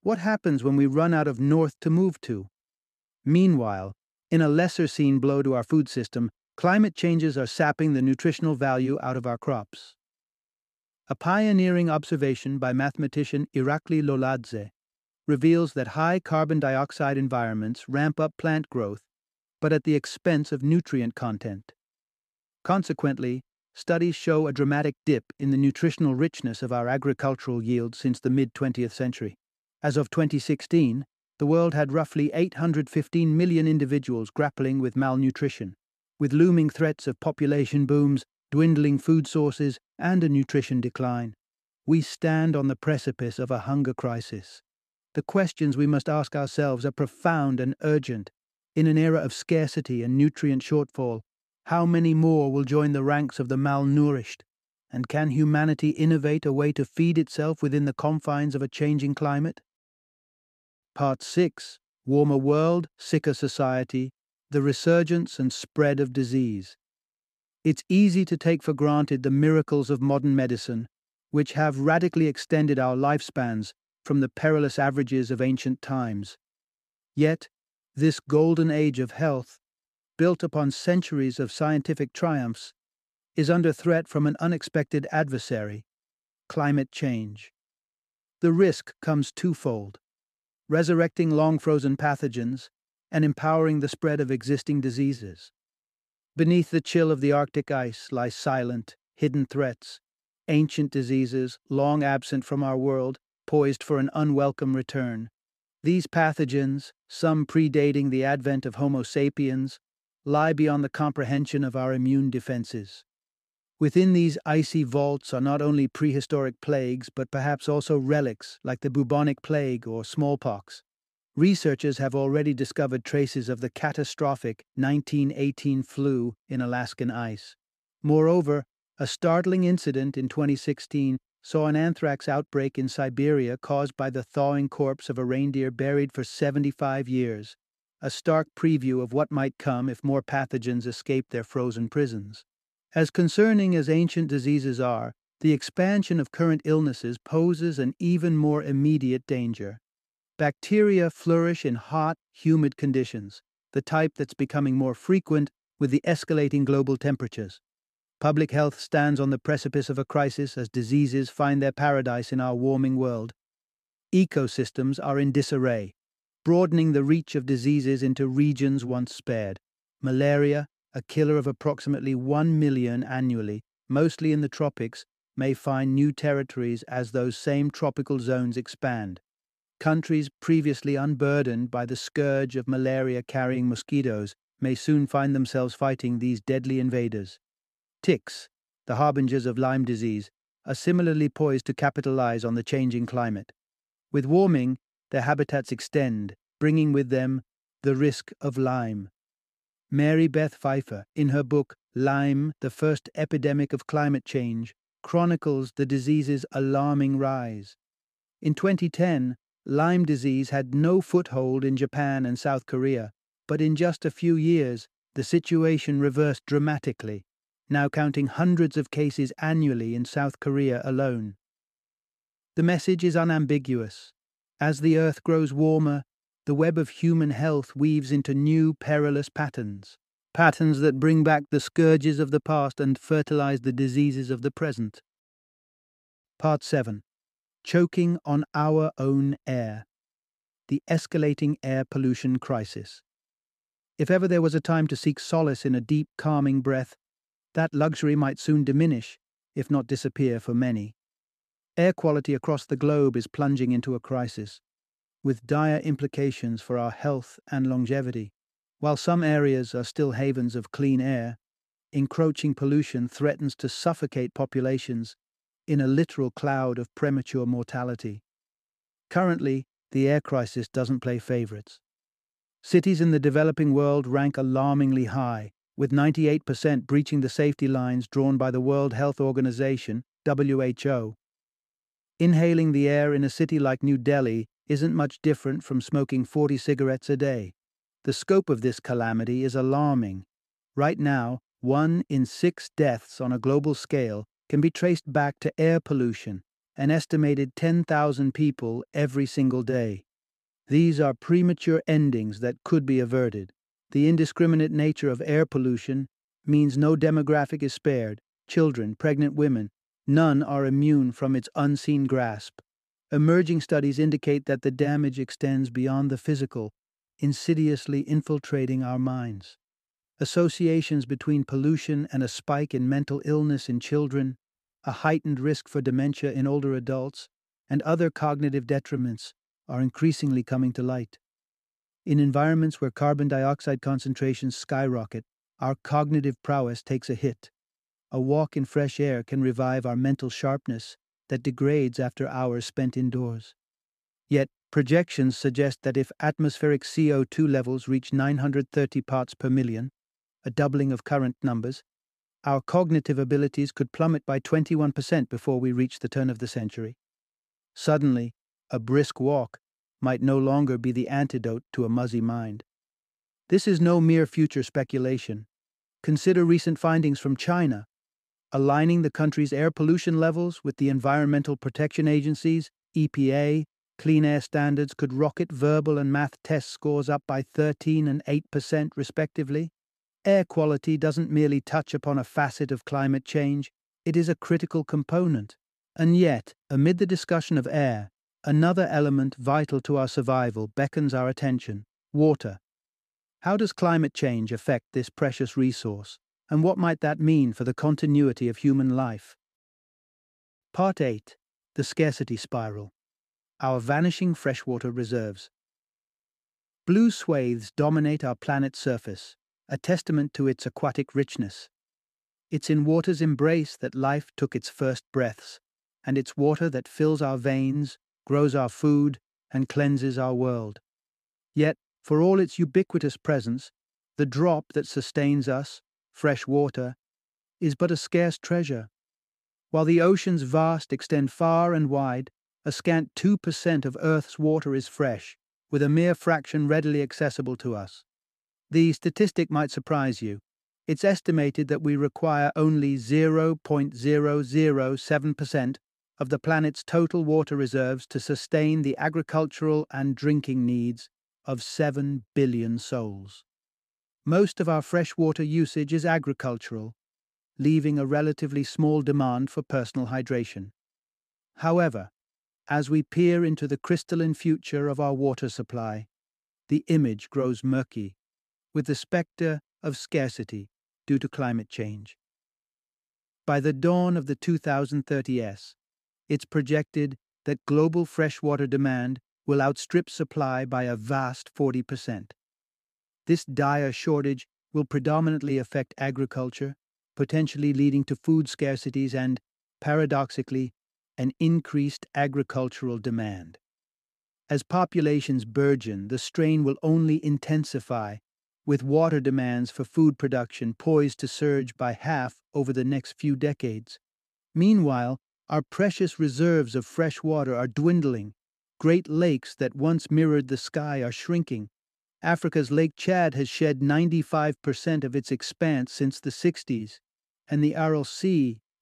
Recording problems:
none

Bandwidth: 14.5 kHz